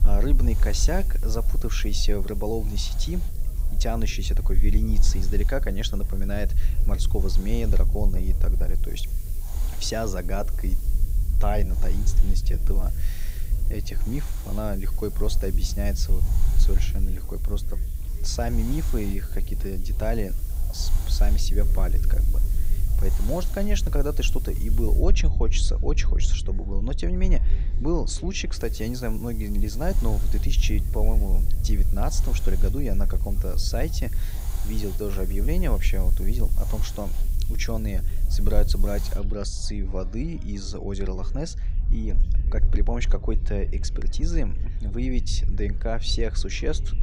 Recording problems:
hiss; noticeable; until 25 s and from 29 to 39 s; 15 dB below the speech
low rumble; noticeable; throughout; 15 dB below the speech
chatter from many people; faint; throughout; 20 dB below the speech

